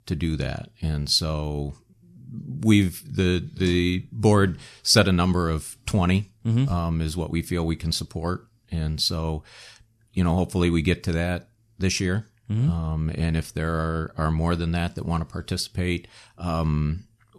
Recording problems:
none

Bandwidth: 13.5 kHz